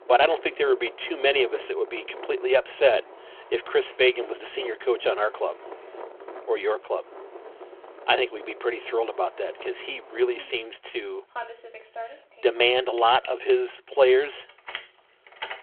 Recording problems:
phone-call audio
traffic noise; noticeable; throughout; 15 dB below the speech

